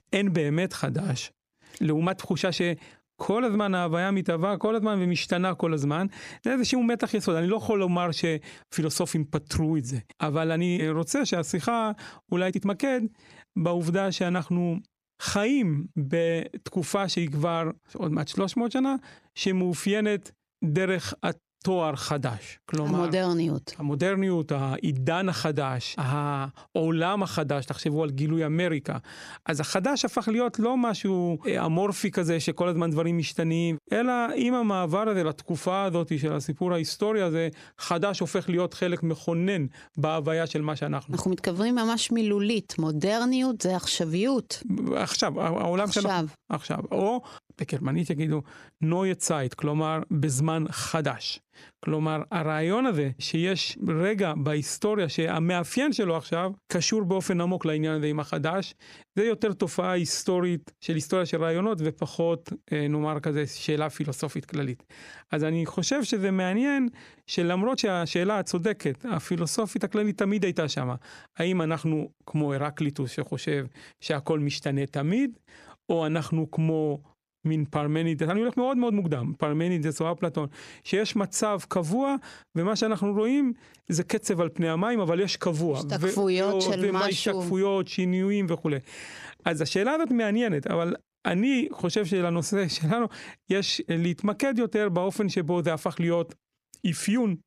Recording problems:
squashed, flat; heavily
uneven, jittery; strongly; from 1.5 s to 1:19

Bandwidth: 15 kHz